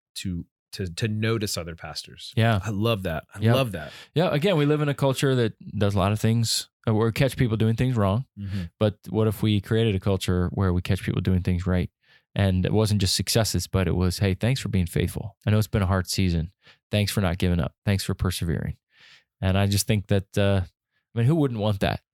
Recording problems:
none

